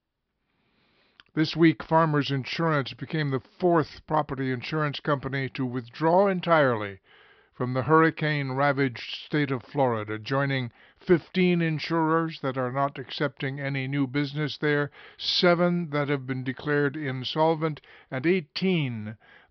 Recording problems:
high frequencies cut off; noticeable; nothing above 5.5 kHz

